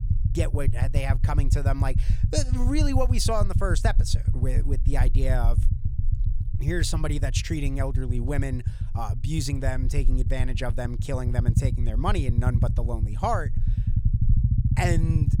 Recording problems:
low rumble; loud; throughout; 9 dB below the speech

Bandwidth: 18 kHz